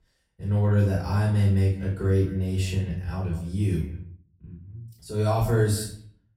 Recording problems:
off-mic speech; far
room echo; noticeable; dies away in 0.4 s
echo of what is said; faint; throughout; 180 ms later, 20 dB below the speech

